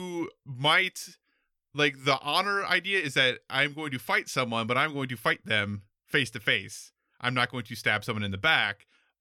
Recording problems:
abrupt cut into speech; at the start

